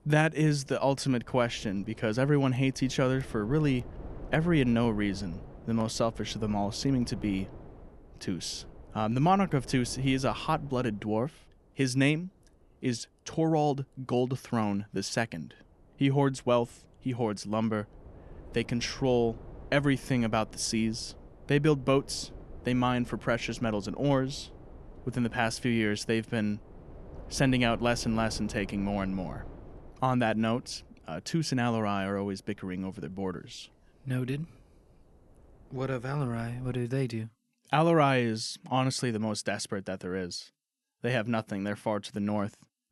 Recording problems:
wind noise on the microphone; occasional gusts; until 37 s; 20 dB below the speech

